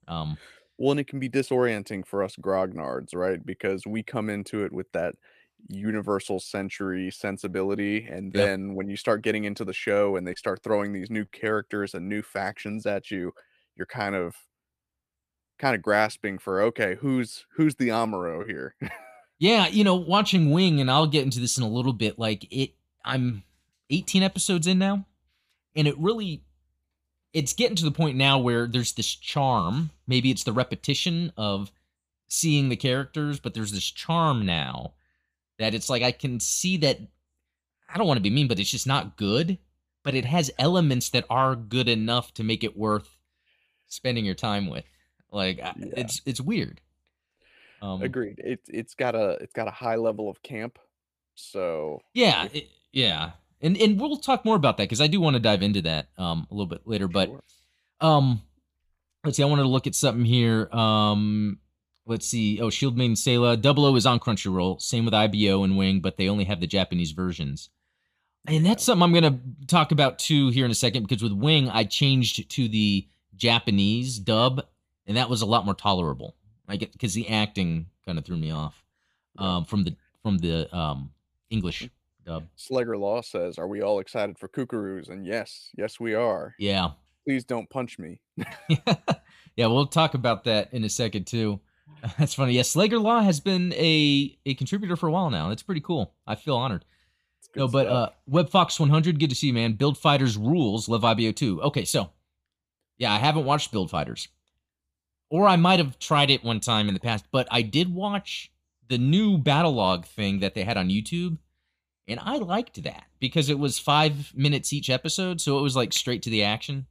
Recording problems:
none

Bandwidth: 14.5 kHz